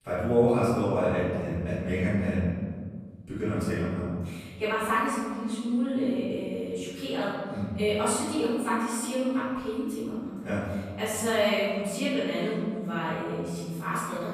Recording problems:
room echo; strong; dies away in 1.7 s
off-mic speech; far

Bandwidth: 14.5 kHz